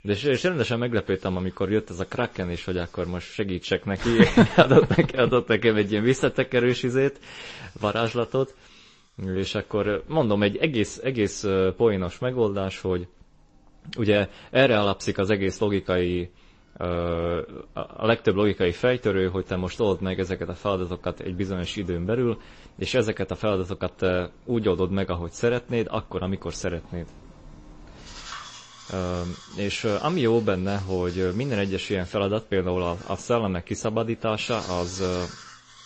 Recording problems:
garbled, watery; slightly; nothing above 8 kHz
household noises; faint; throughout; 20 dB below the speech

